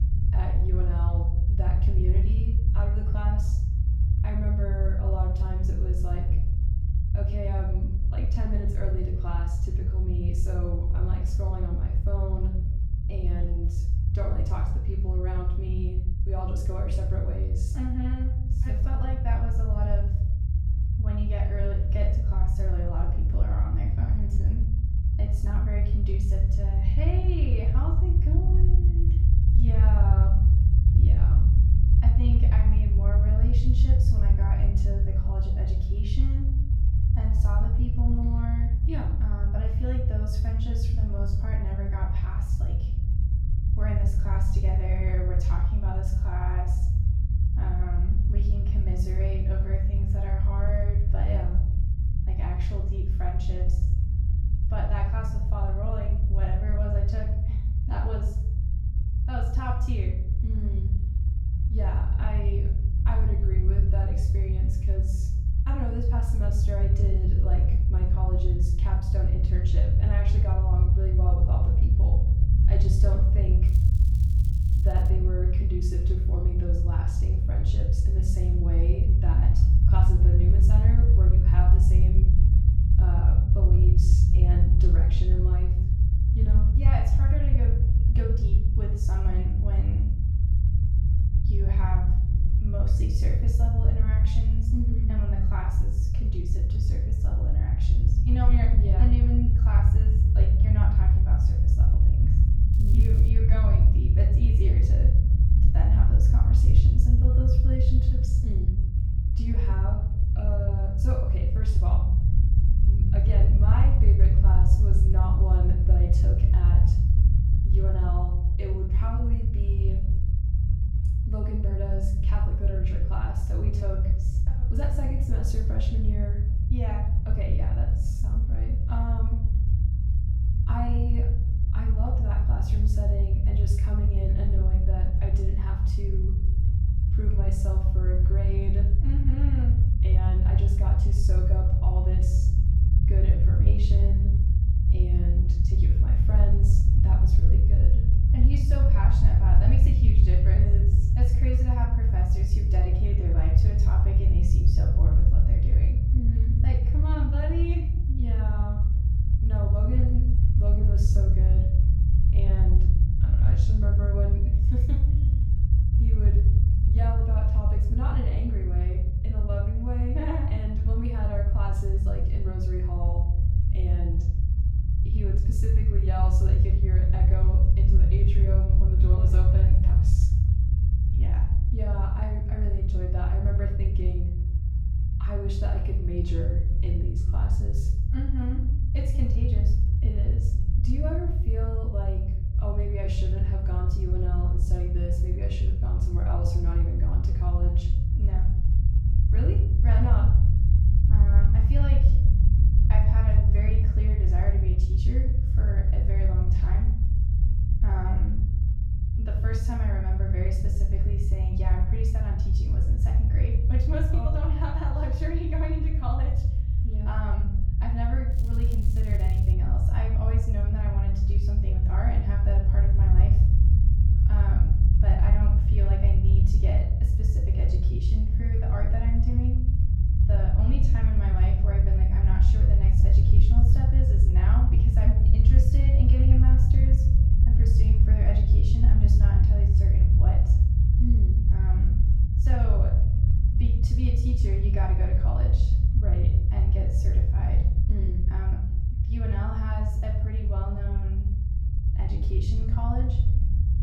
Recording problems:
off-mic speech; far
room echo; noticeable; dies away in 0.5 s
low rumble; loud; throughout; 1 dB below the speech
crackling; noticeable; from 1:14 to 1:15, at 1:43 and from 3:38 to 3:40; 15 dB below the speech

